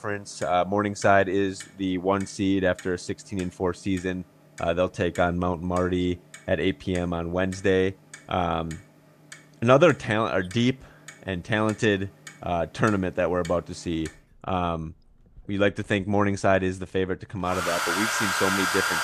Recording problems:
household noises; loud; throughout; 4 dB below the speech

